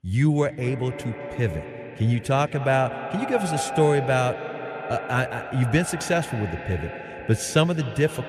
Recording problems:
echo of what is said; strong; throughout; 210 ms later, 9 dB below the speech

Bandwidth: 14.5 kHz